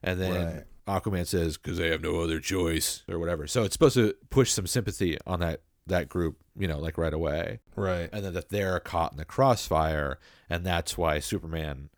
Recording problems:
none

